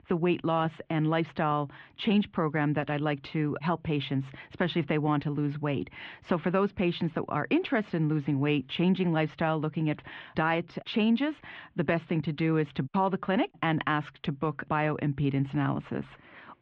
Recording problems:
muffled; very; fading above 3 kHz

